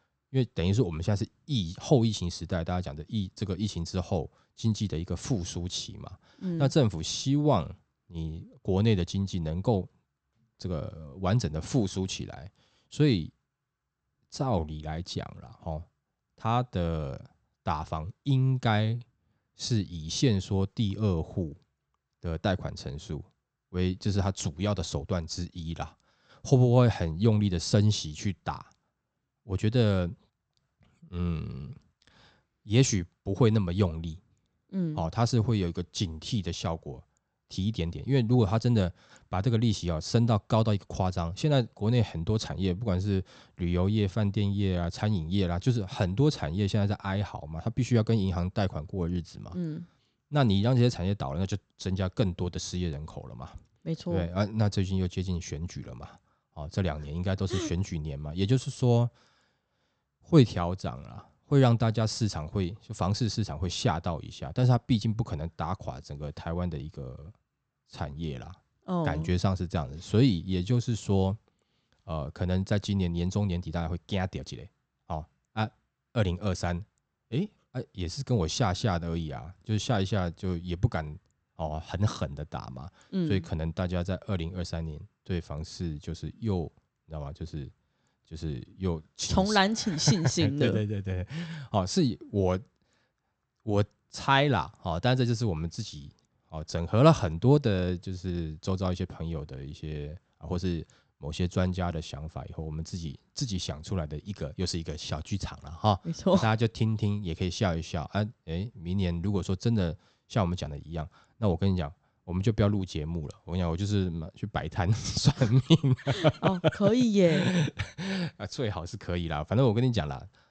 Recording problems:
high frequencies cut off; noticeable; nothing above 8 kHz

